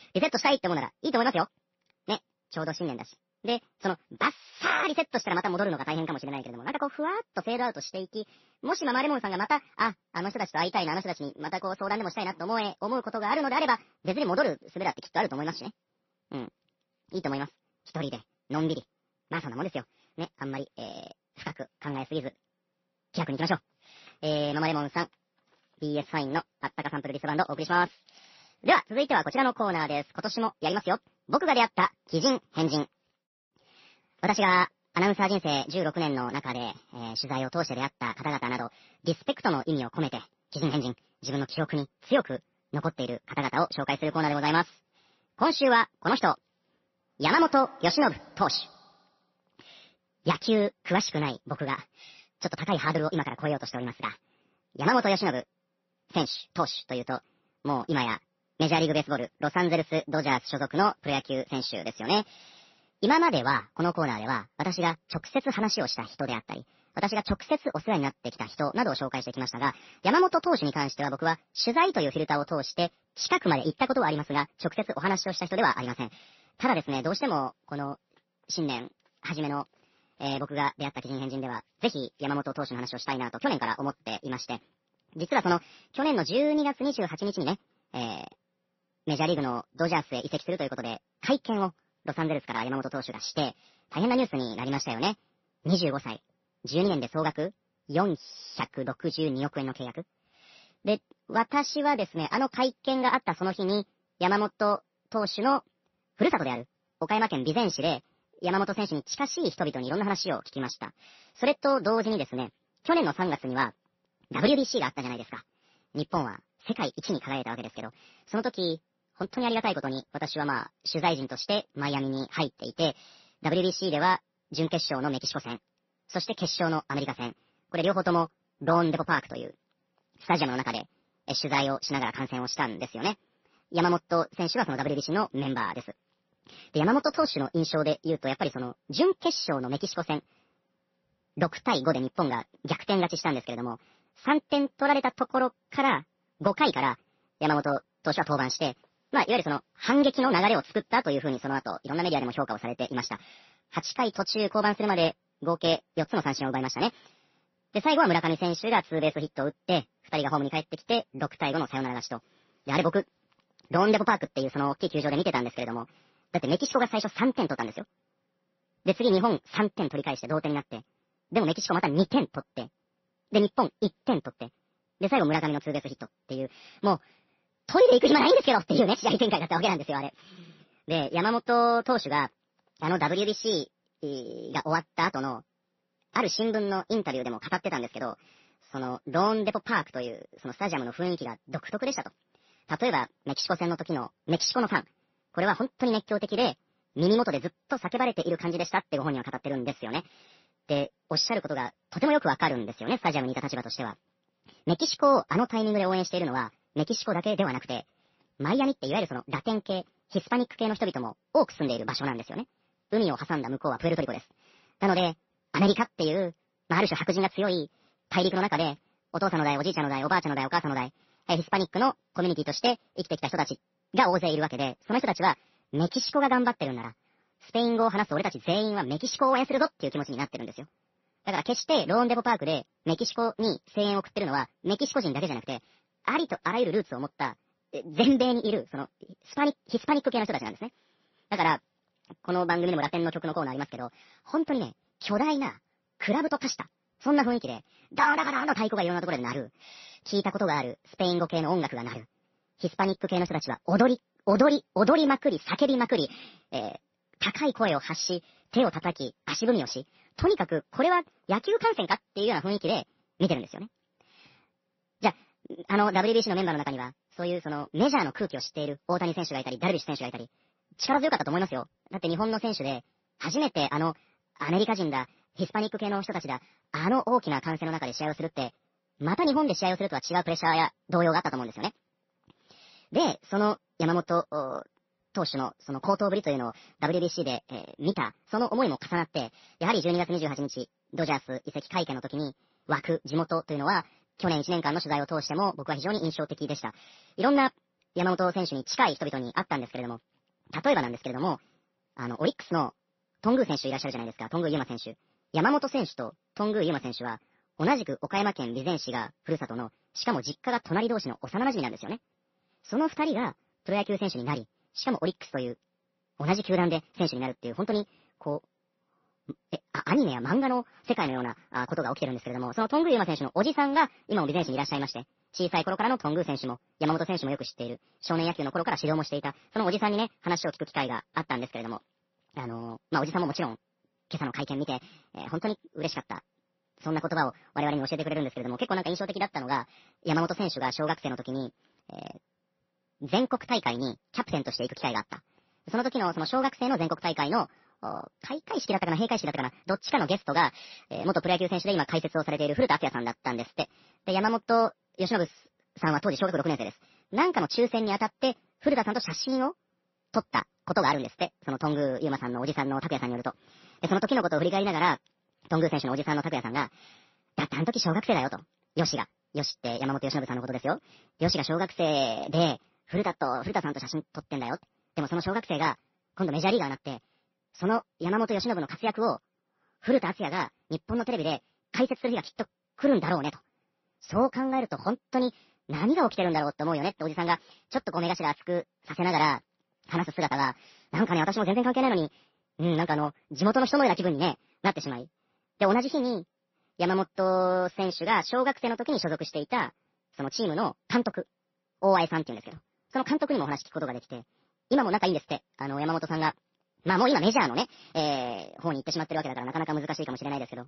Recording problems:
wrong speed and pitch; too fast and too high; 1.5 times normal speed
garbled, watery; slightly; nothing above 6 kHz

